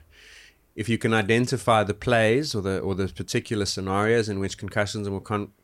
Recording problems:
none

